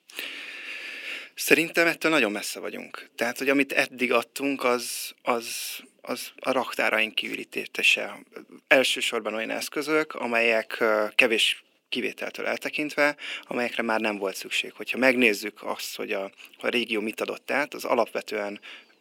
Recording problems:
thin; somewhat; fading below 300 Hz

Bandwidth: 16.5 kHz